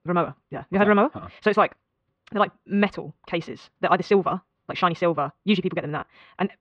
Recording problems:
muffled; very; fading above 3 kHz
wrong speed, natural pitch; too fast; 1.7 times normal speed

